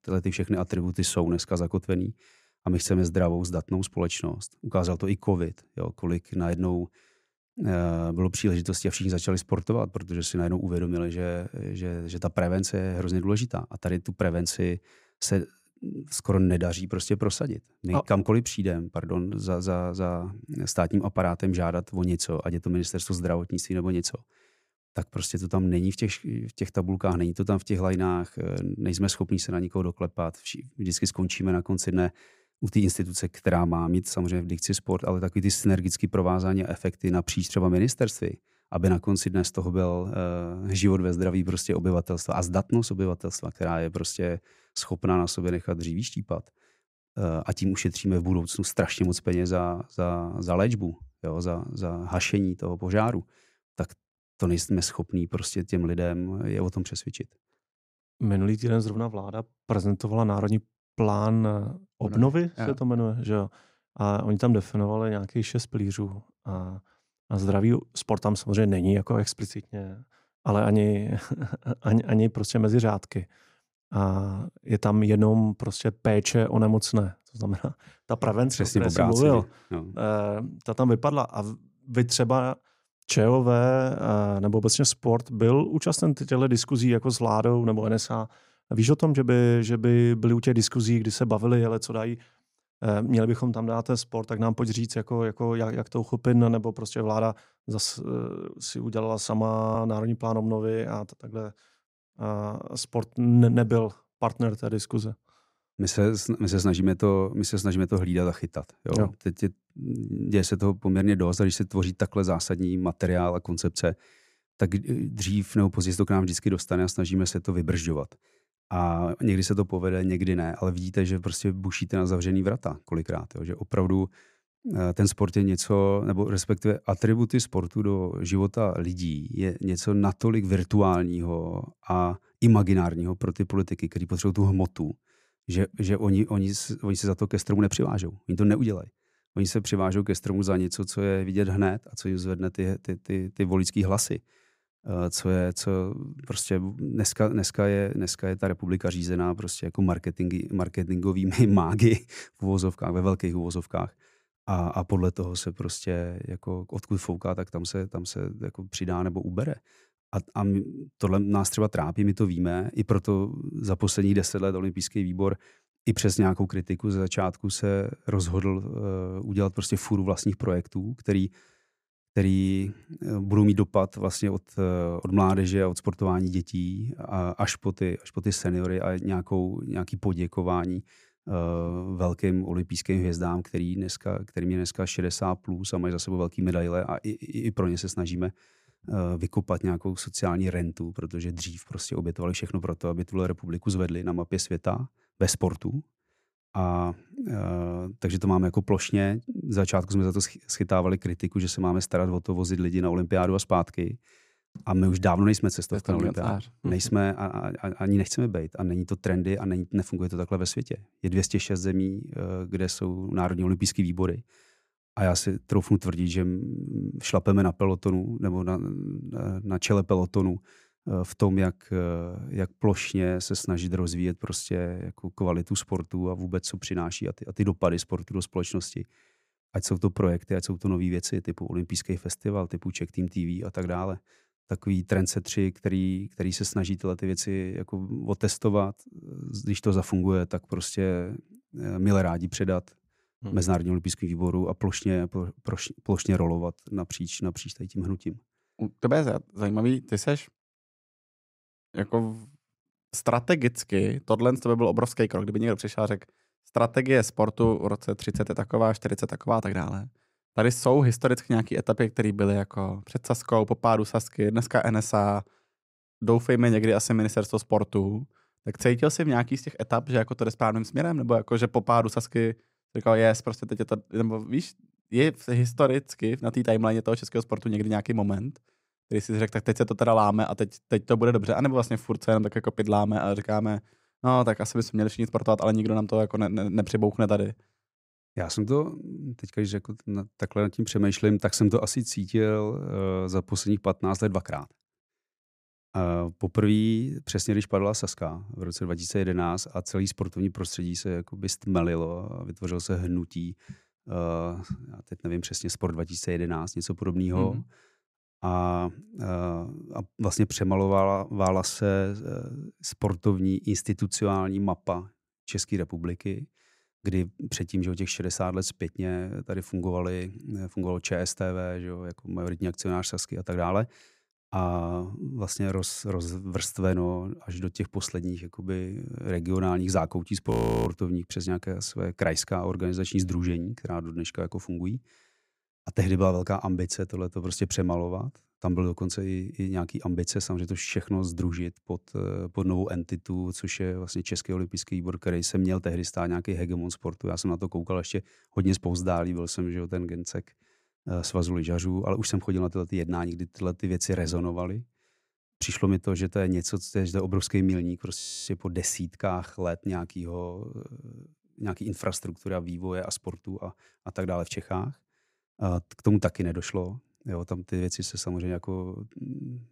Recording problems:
audio freezing; at 1:40, at 5:30 and at 5:58

